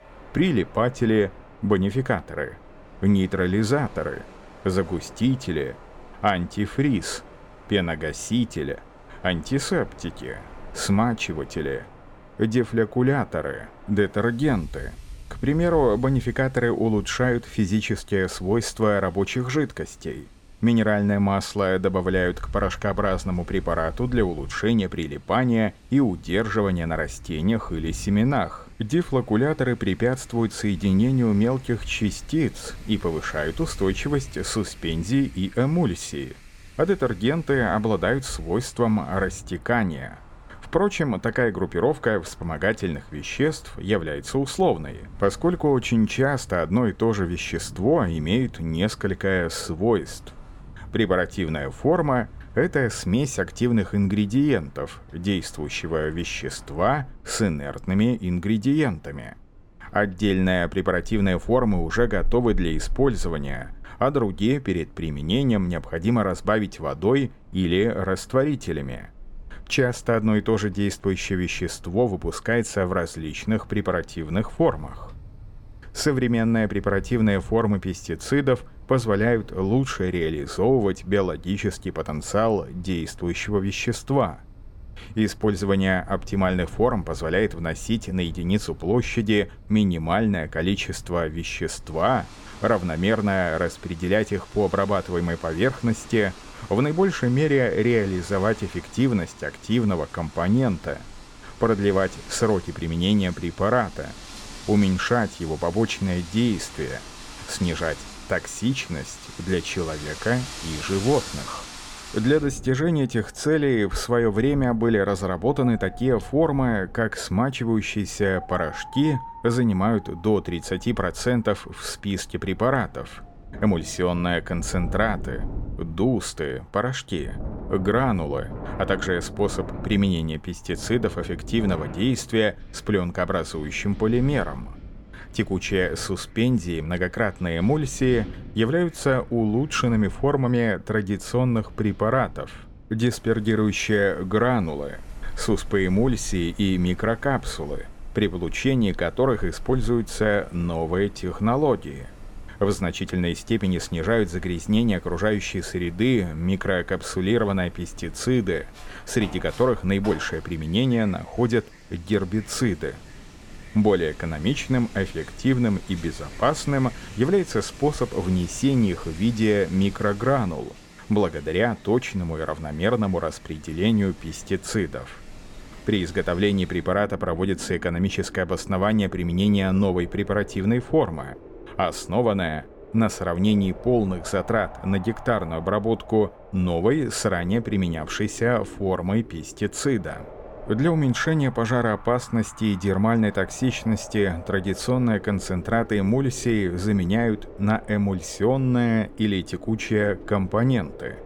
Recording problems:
wind in the background; noticeable; throughout; 20 dB below the speech

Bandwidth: 17.5 kHz